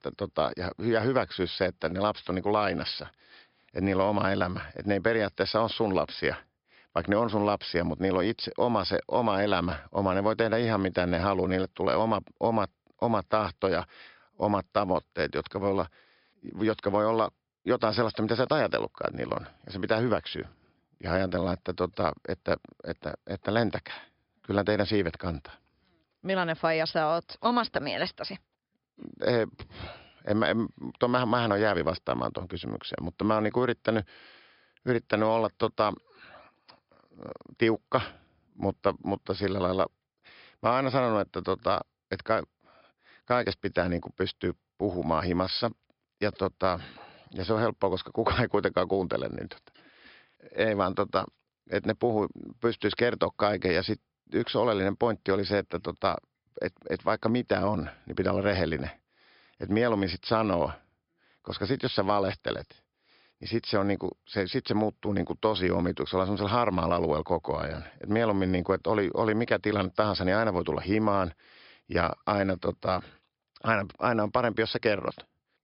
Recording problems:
high frequencies cut off; noticeable; nothing above 5.5 kHz

